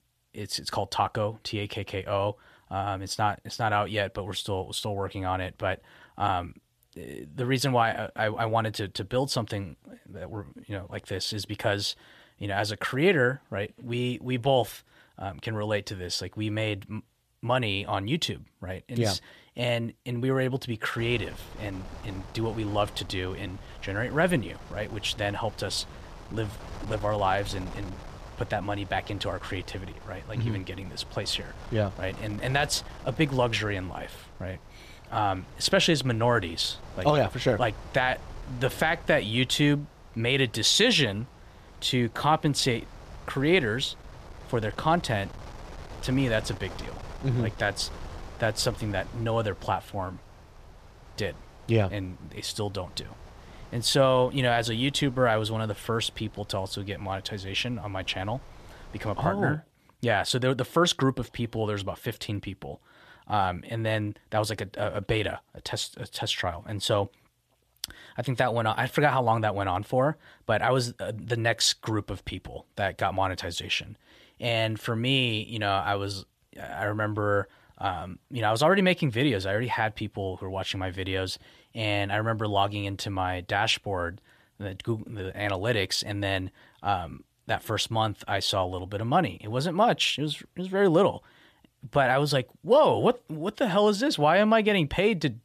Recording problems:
wind noise on the microphone; occasional gusts; from 21 to 59 s; 20 dB below the speech

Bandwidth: 14.5 kHz